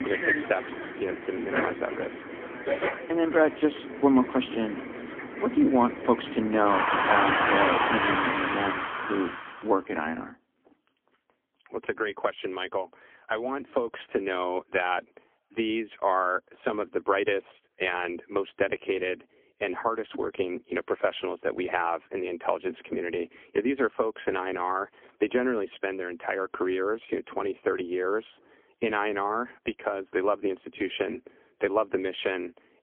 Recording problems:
phone-call audio; poor line; nothing above 3.5 kHz
traffic noise; loud; until 9.5 s; 1 dB below the speech

